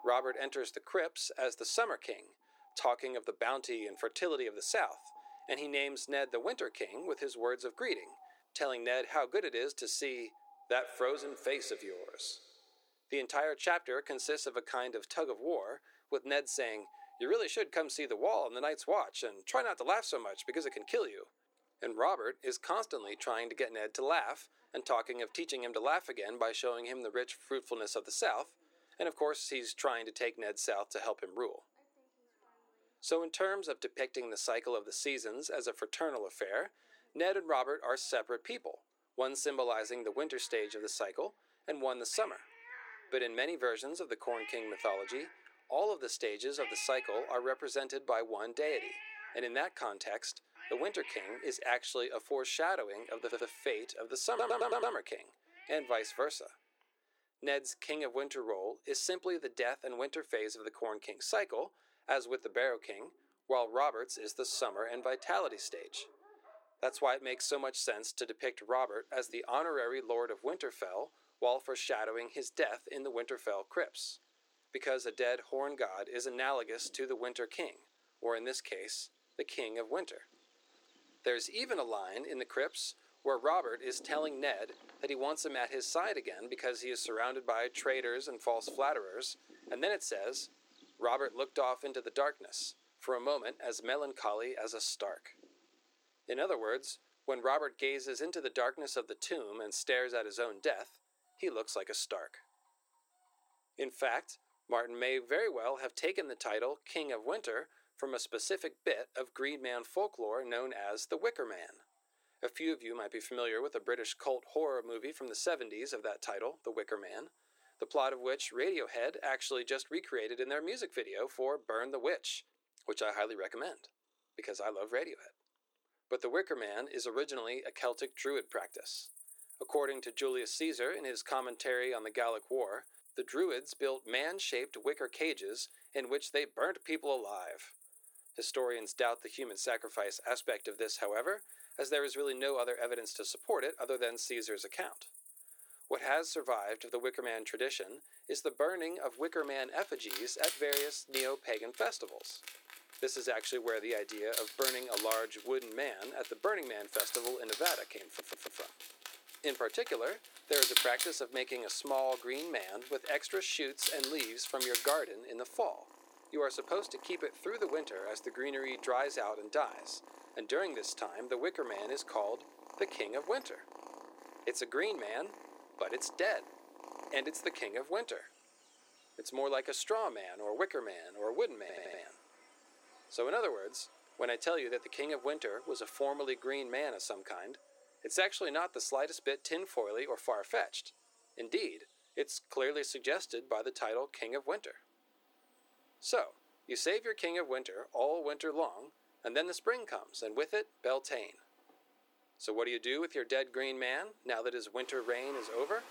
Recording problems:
thin; very; fading below 300 Hz
animal sounds; loud; throughout; 7 dB below the speech
audio stuttering; 4 times, first at 53 s

